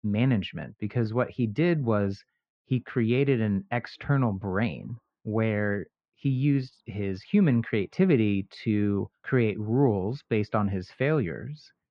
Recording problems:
muffled; very; fading above 2 kHz

